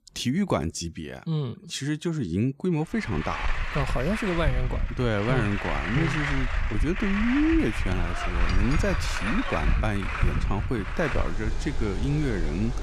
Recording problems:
traffic noise; loud; from 3 s on; 2 dB below the speech

